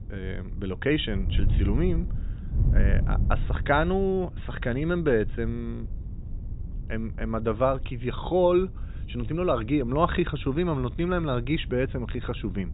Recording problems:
high frequencies cut off; severe; nothing above 4 kHz
wind noise on the microphone; occasional gusts; 20 dB below the speech

